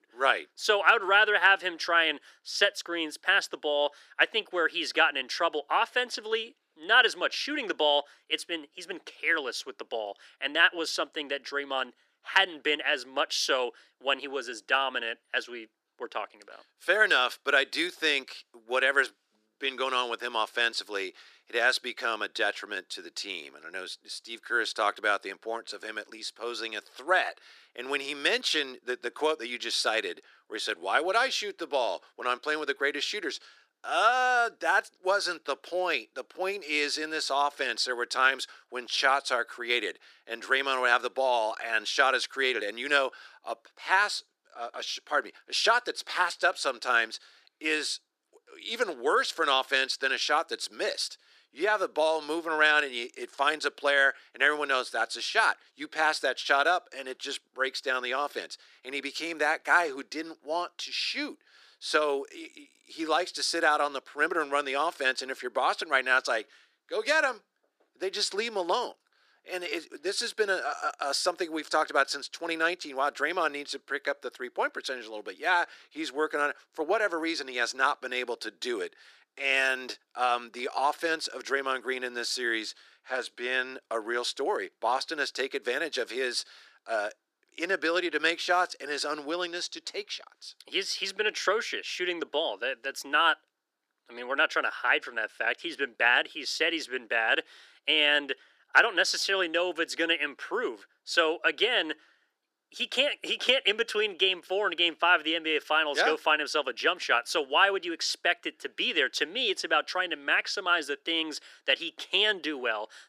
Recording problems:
thin; very; fading below 350 Hz

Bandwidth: 14.5 kHz